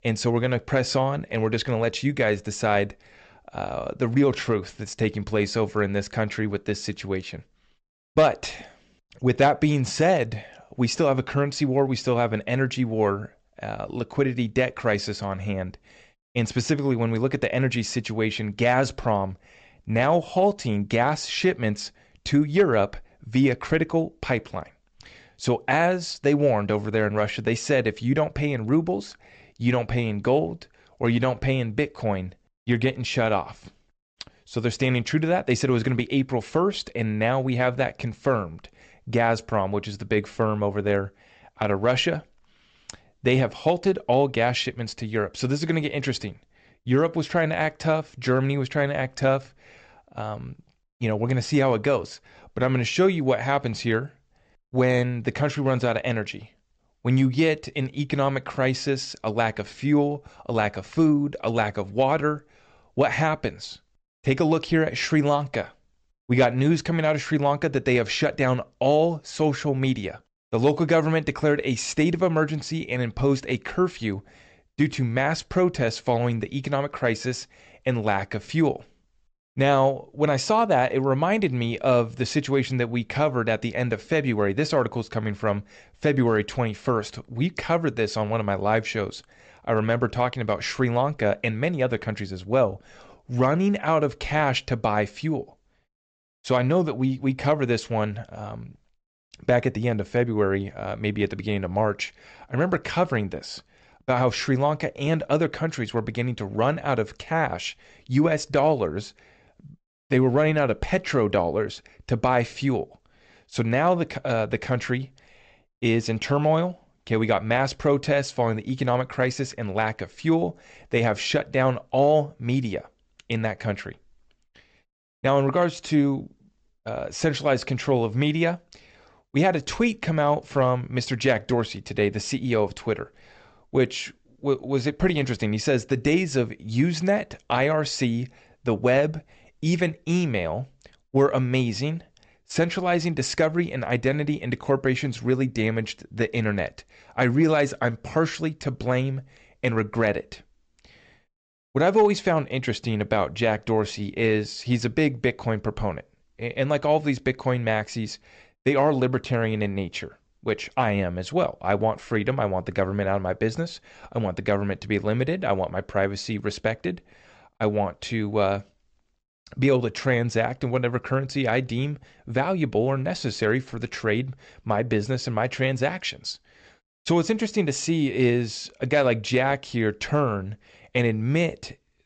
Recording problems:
high frequencies cut off; noticeable; nothing above 8 kHz

